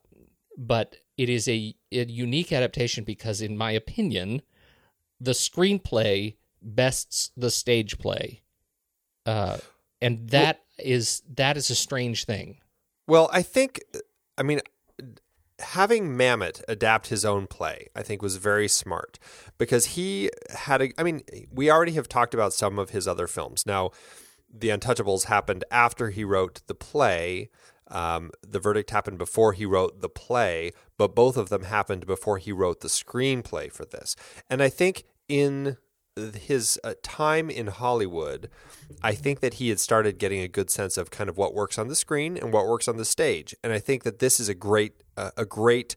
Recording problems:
none

